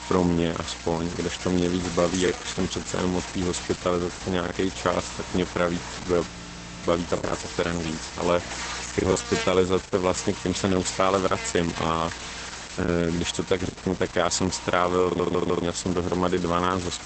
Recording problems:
garbled, watery; badly; nothing above 8 kHz
electrical hum; loud; throughout; 60 Hz, 9 dB below the speech
choppy; occasionally; from 2.5 to 4.5 s, from 7.5 to 10 s and from 13 to 16 s; 5% of the speech affected
audio freezing; at 6.5 s for 0.5 s
audio stuttering; at 15 s

